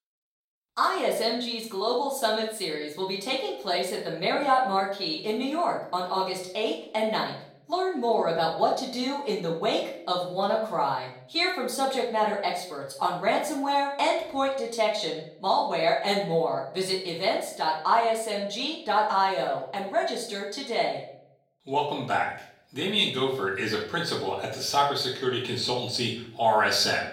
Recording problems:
off-mic speech; far
room echo; noticeable; dies away in 0.5 s
thin; very slightly; fading below 1 kHz

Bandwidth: 16.5 kHz